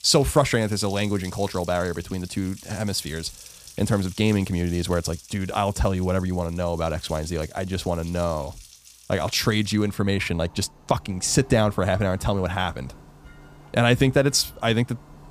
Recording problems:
household noises; faint; throughout; 20 dB below the speech

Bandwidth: 15 kHz